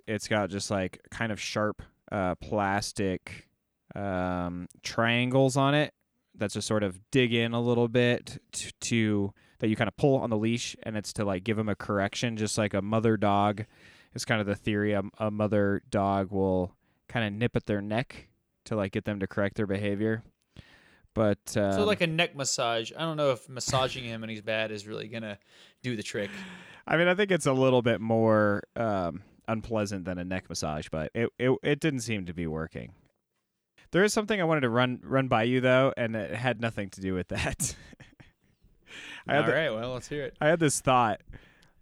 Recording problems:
uneven, jittery; strongly; from 1 to 39 s

